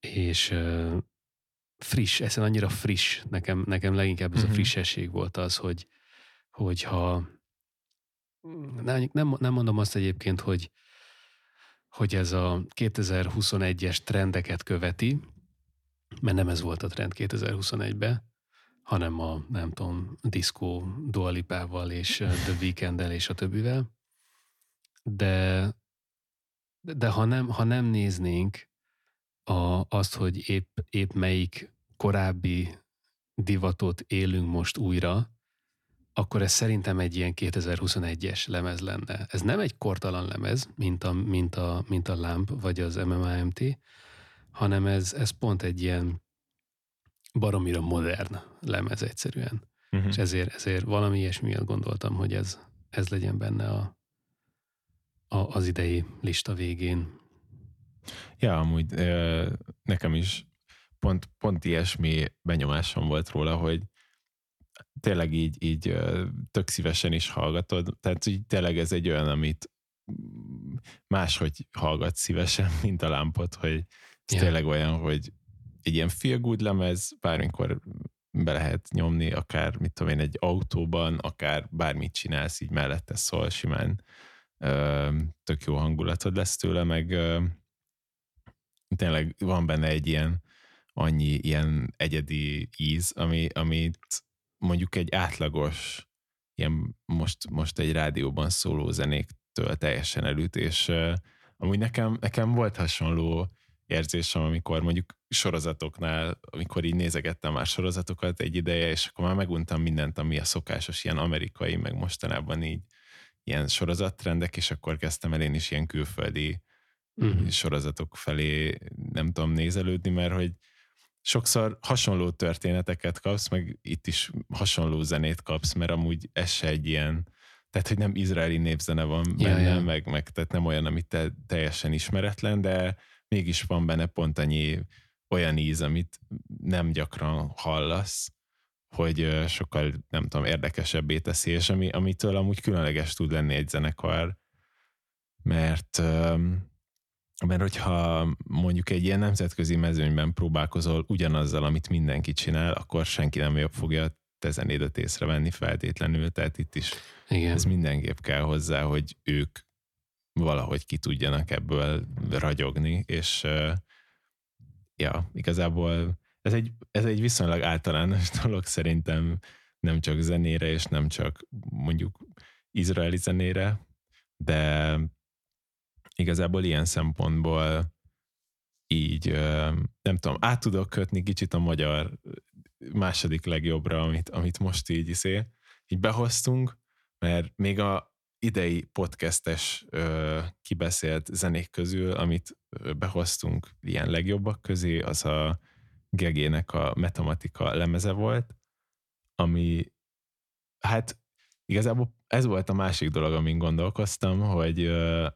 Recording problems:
none

